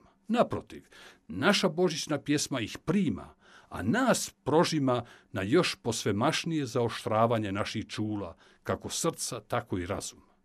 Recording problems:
none

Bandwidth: 13.5 kHz